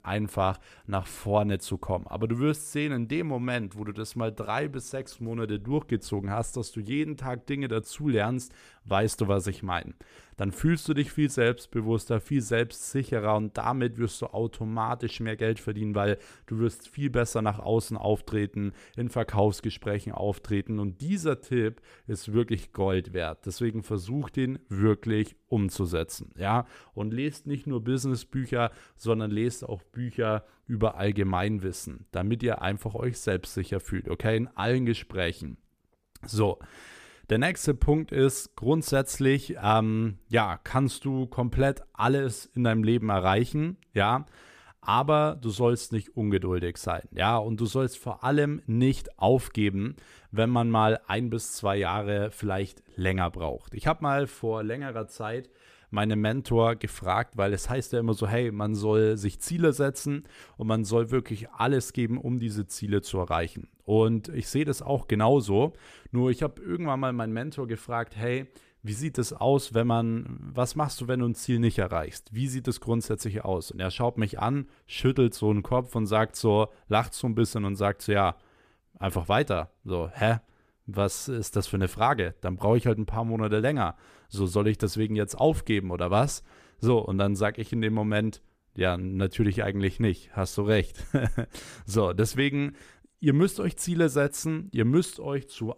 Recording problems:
none

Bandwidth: 14.5 kHz